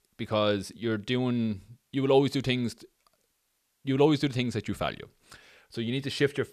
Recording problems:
none

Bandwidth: 14.5 kHz